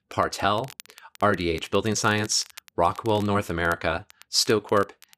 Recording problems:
crackle, like an old record; faint; 25 dB below the speech

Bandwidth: 14.5 kHz